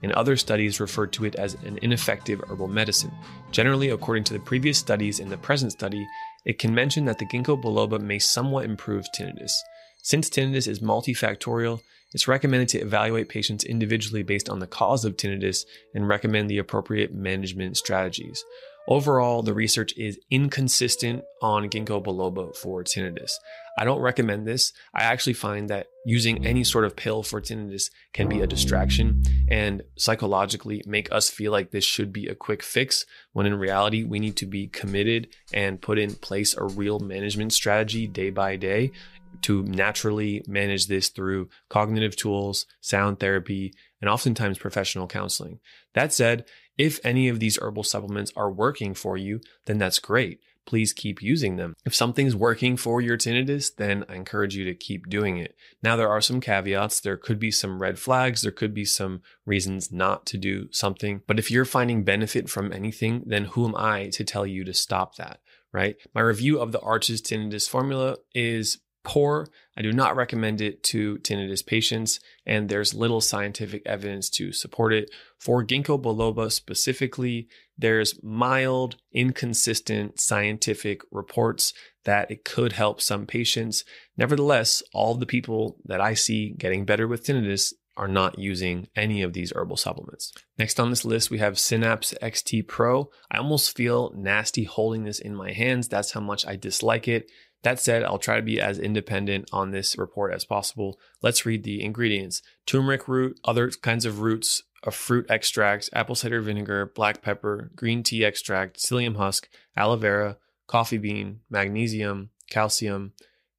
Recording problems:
background music; loud; until 40 s; 9 dB below the speech

